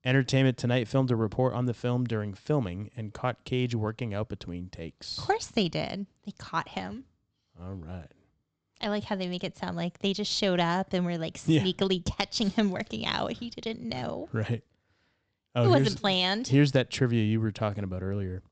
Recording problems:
high frequencies cut off; noticeable; nothing above 8 kHz

